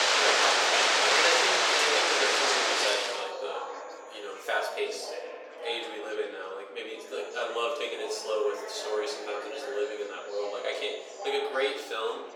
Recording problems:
off-mic speech; far
thin; very; fading below 450 Hz
room echo; noticeable; dies away in 0.8 s
rain or running water; very loud; until 3 s; 10 dB above the speech
chatter from many people; loud; throughout; 8 dB below the speech
high-pitched whine; faint; from 1.5 to 5 s and from 7 to 11 s; 7 kHz, 25 dB below the speech

